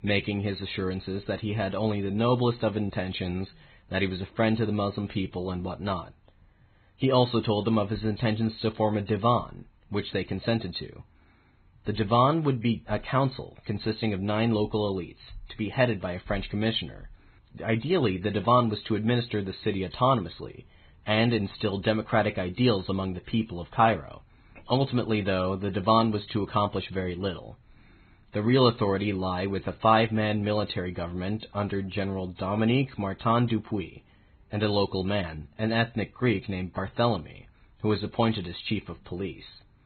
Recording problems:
garbled, watery; badly; nothing above 4 kHz

